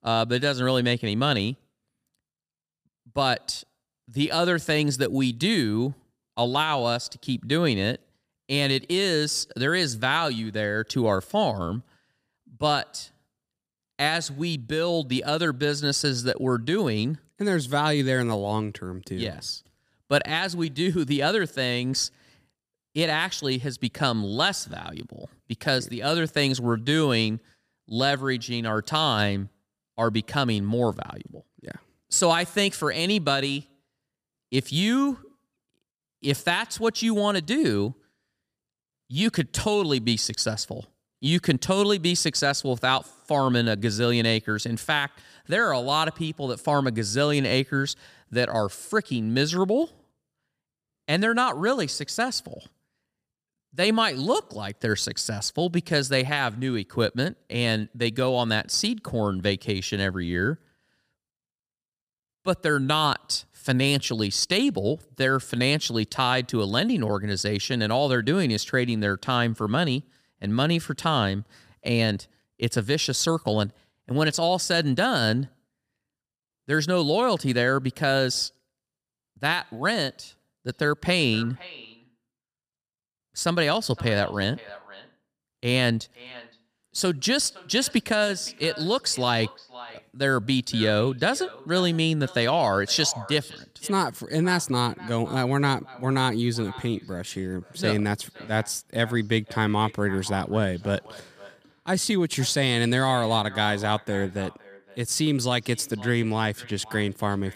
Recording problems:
echo of what is said; faint; from 1:21 on; 510 ms later, 20 dB below the speech

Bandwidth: 15 kHz